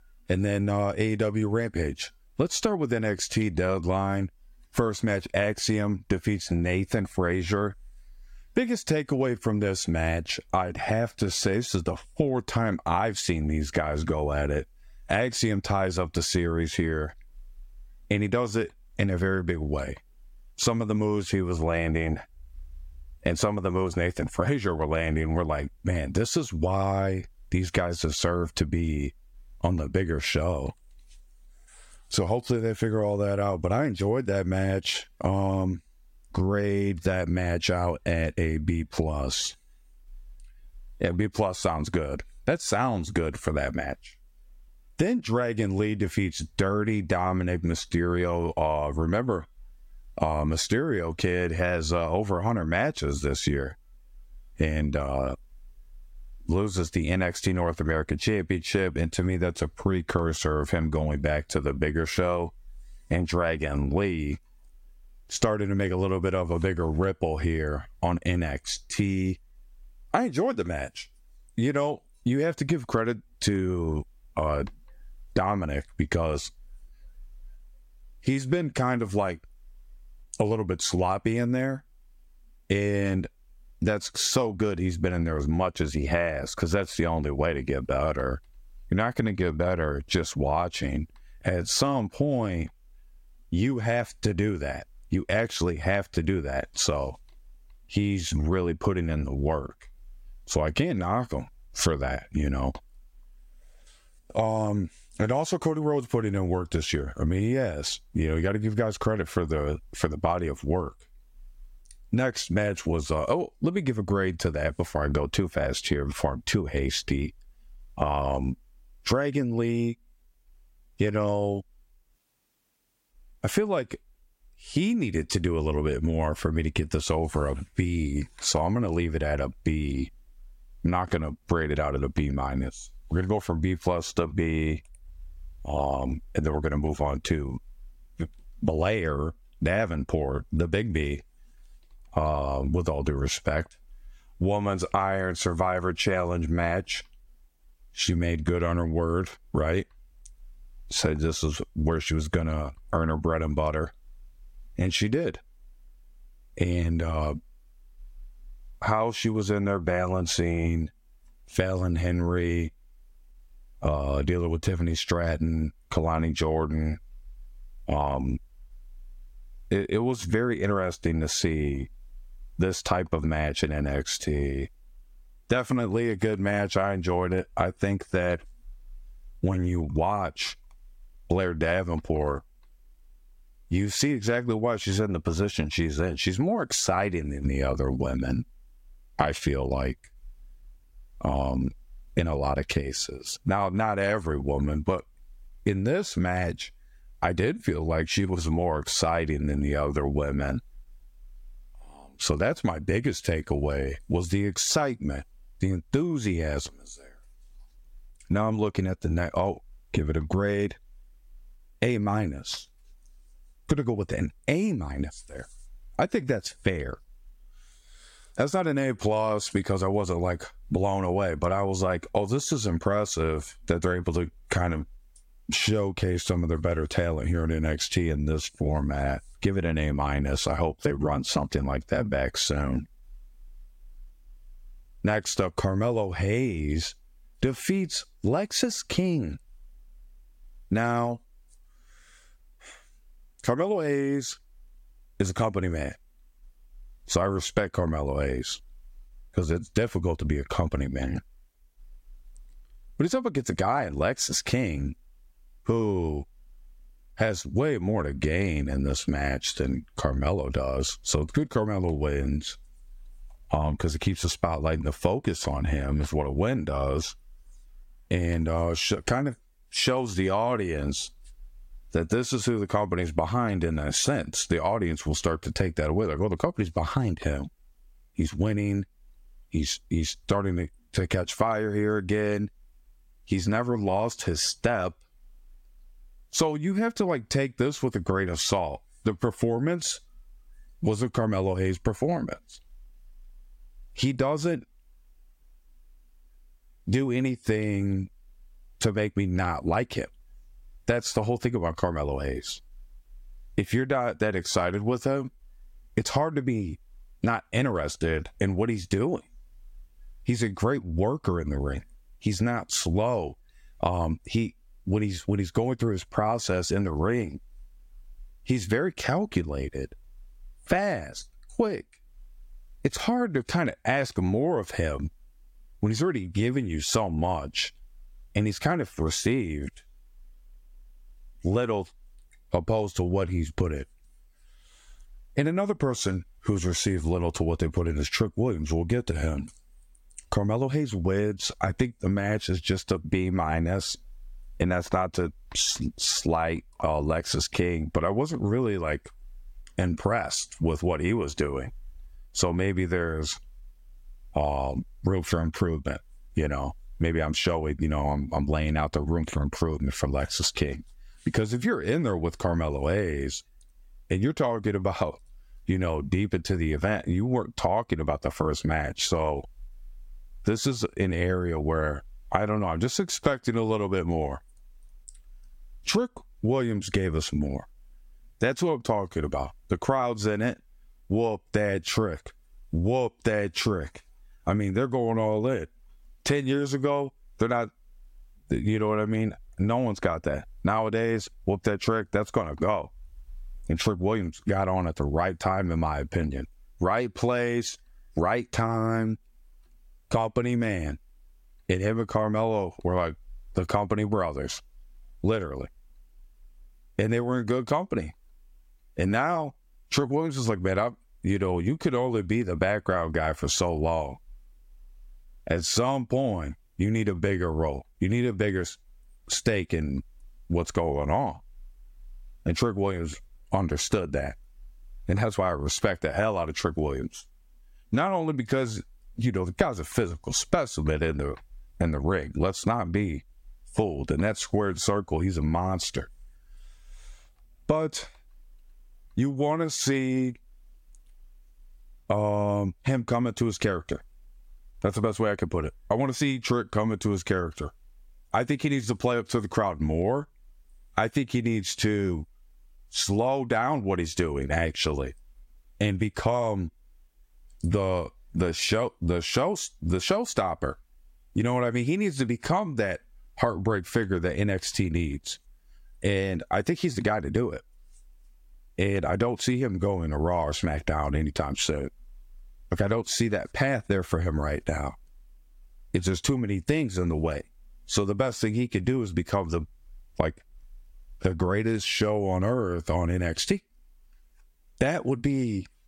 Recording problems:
squashed, flat; somewhat

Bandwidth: 16 kHz